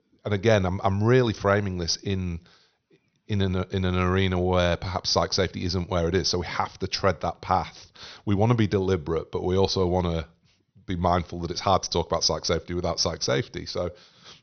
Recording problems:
high frequencies cut off; noticeable; nothing above 6 kHz

